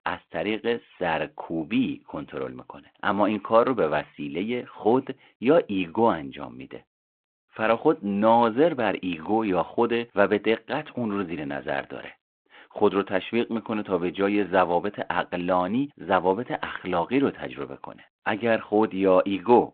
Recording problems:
phone-call audio

